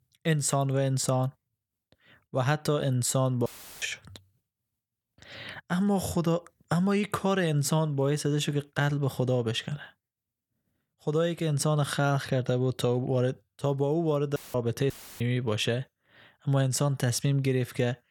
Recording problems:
audio cutting out; filled with static; at 3.5 s, at 14 s and at 15 s

